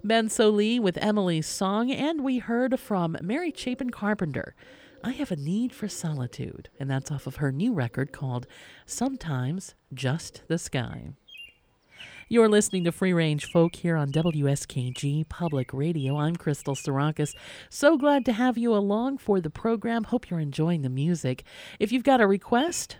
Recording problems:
animal sounds; faint; throughout; 25 dB below the speech

